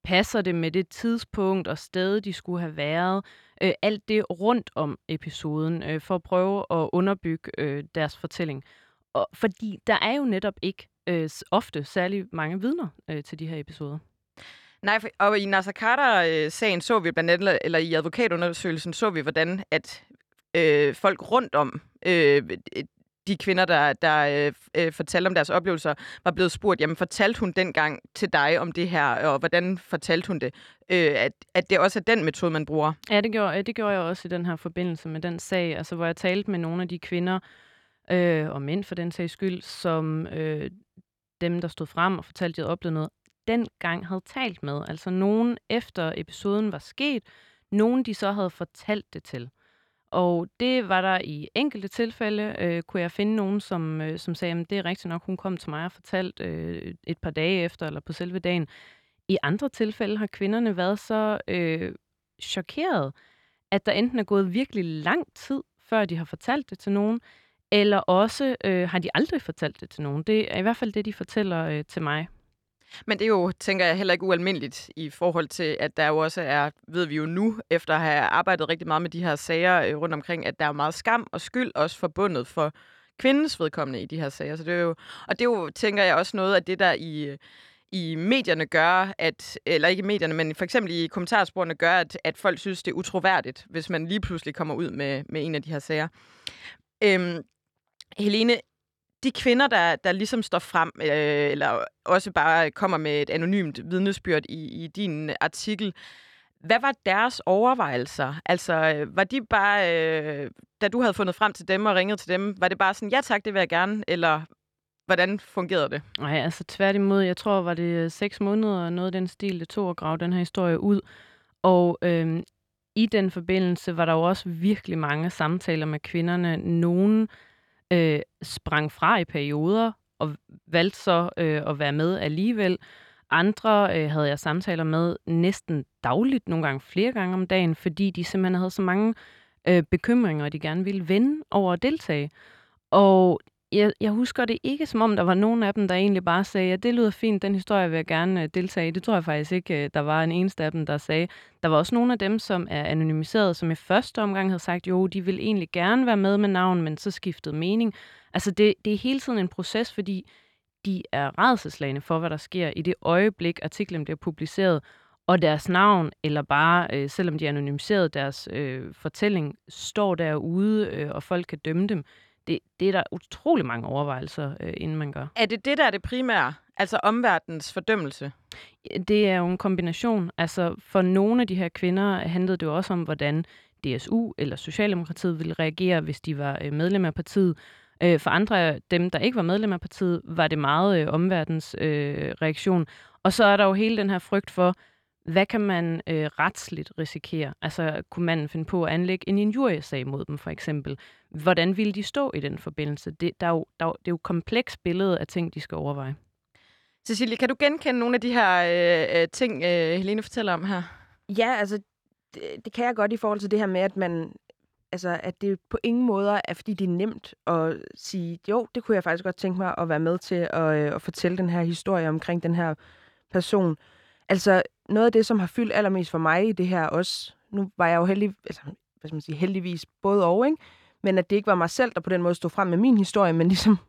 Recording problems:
none

